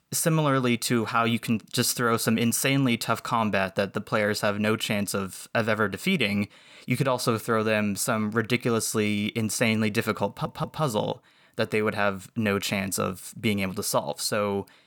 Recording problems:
audio stuttering; at 10 s

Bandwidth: 18.5 kHz